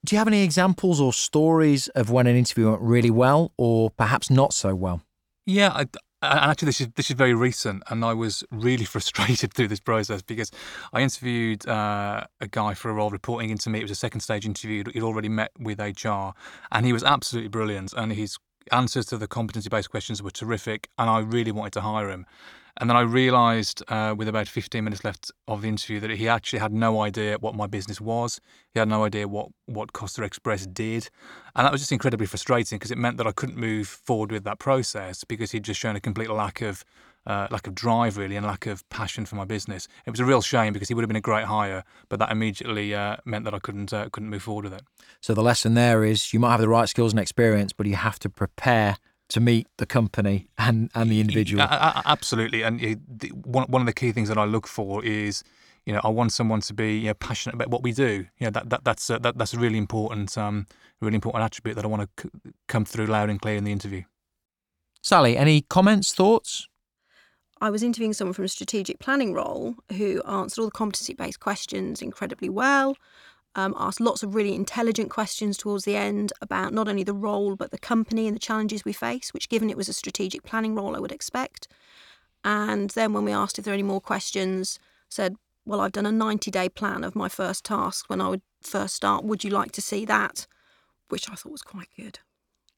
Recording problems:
none

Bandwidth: 18 kHz